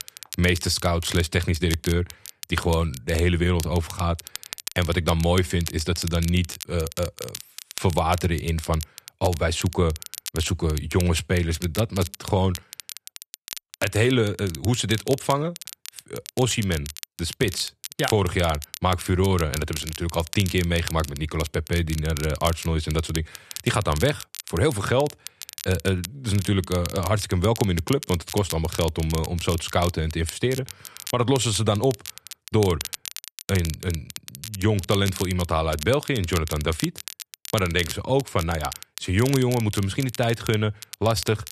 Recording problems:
crackle, like an old record; noticeable; 10 dB below the speech

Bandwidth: 13.5 kHz